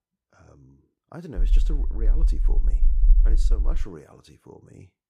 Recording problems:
low rumble; loud; from 1.5 to 4 s; 7 dB below the speech

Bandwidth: 15.5 kHz